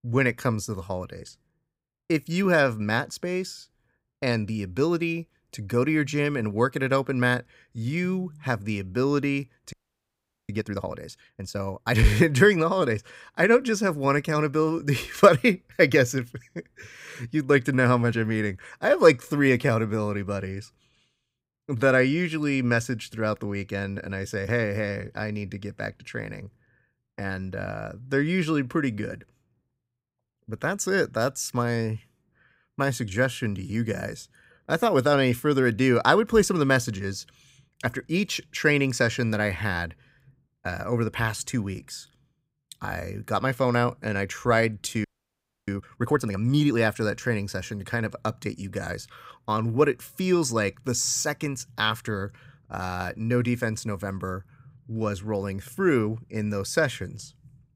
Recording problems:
audio freezing; at 9.5 s for 1 s and at 45 s for 0.5 s

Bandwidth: 15.5 kHz